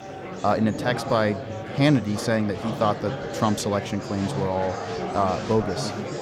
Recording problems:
murmuring crowd; loud; throughout; 7 dB below the speech

